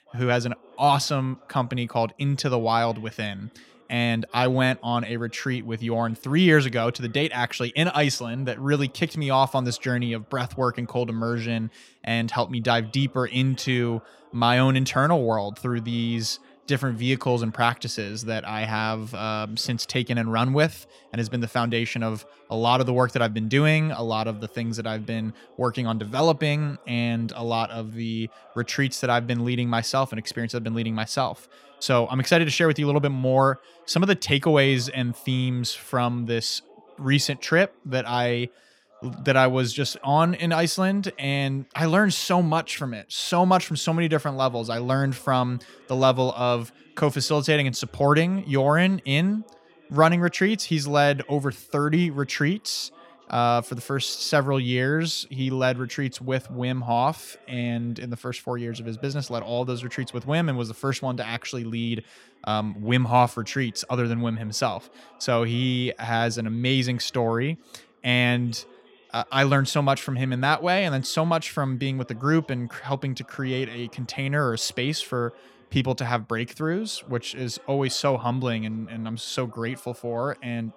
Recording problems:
background chatter; faint; throughout; 2 voices, 30 dB below the speech

